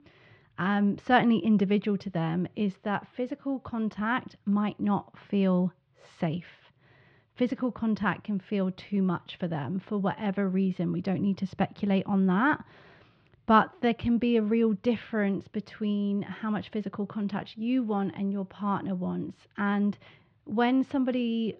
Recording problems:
muffled; very; fading above 3 kHz

